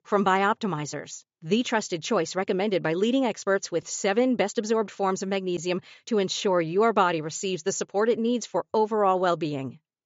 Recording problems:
high frequencies cut off; noticeable; nothing above 7.5 kHz

